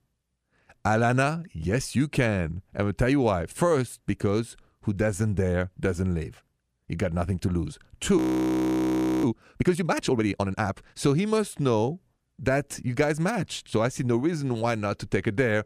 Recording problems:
audio freezing; at 8 s for 1 s

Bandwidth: 14.5 kHz